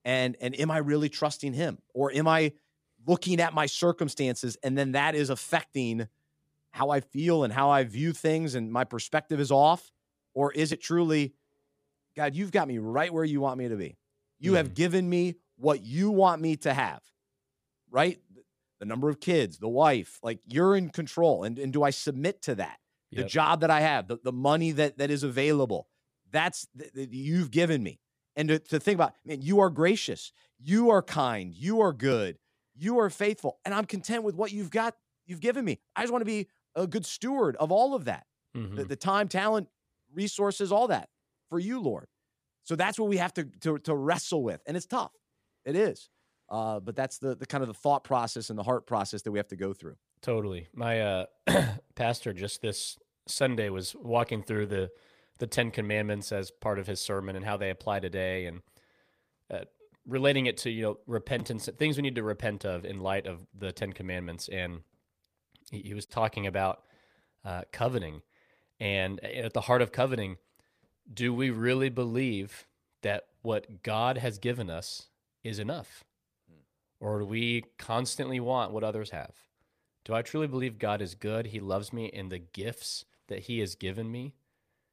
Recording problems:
none

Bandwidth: 15 kHz